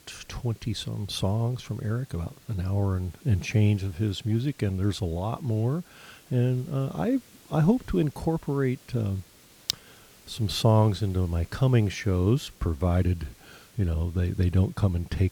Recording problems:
hiss; faint; throughout; 25 dB below the speech

